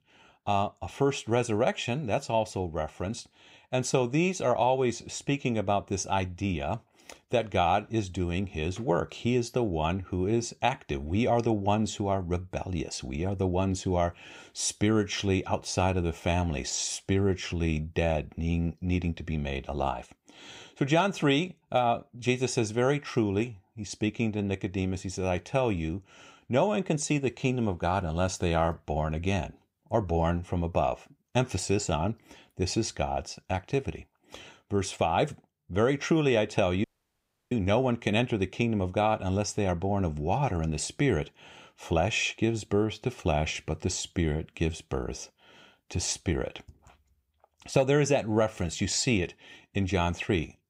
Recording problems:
audio cutting out; at 37 s for 0.5 s

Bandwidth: 15.5 kHz